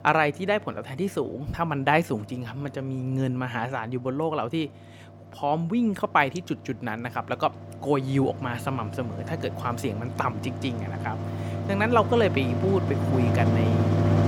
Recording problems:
machinery noise; loud; throughout; 1 dB below the speech

